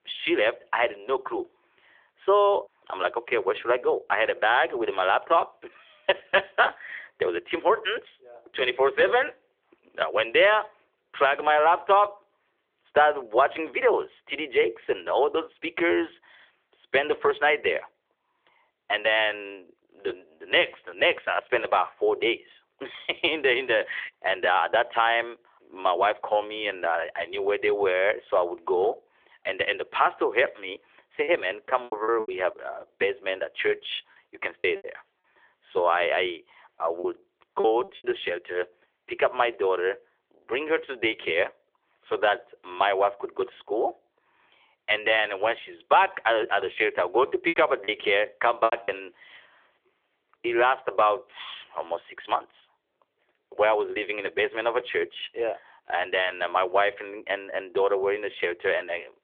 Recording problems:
phone-call audio; nothing above 3.5 kHz
choppy; very; from 31 to 35 s, from 37 to 38 s and from 47 to 49 s; 13% of the speech affected

